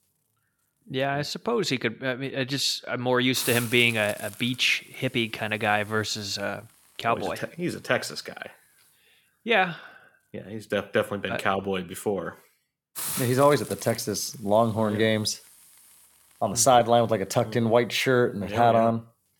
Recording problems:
hiss; noticeable; throughout; 15 dB below the speech

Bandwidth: 17.5 kHz